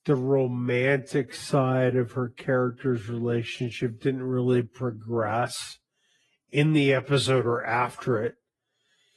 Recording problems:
wrong speed, natural pitch; too slow; 0.6 times normal speed
garbled, watery; slightly; nothing above 11 kHz

